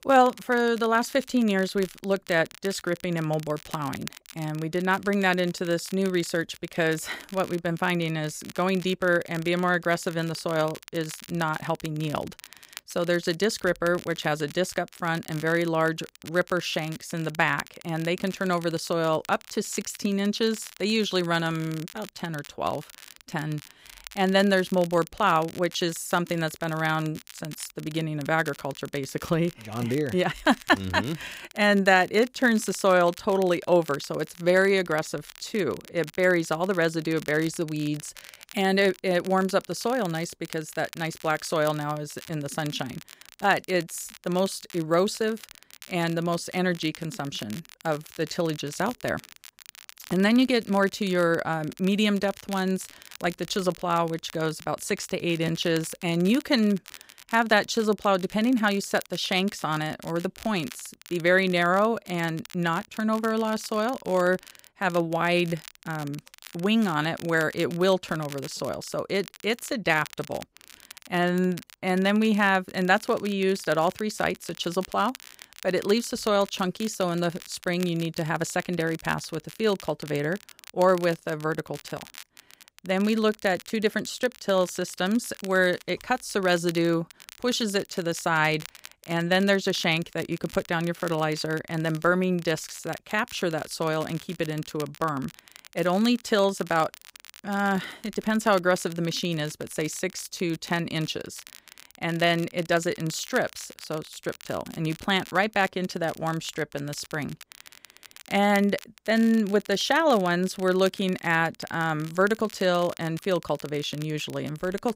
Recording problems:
crackle, like an old record; noticeable; 20 dB below the speech

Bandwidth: 15.5 kHz